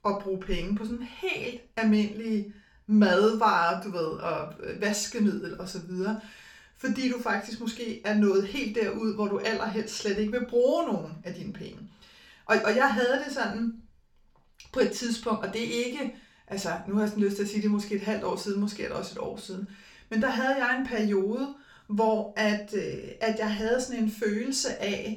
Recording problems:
off-mic speech; far
room echo; slight; dies away in 0.3 s

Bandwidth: 18 kHz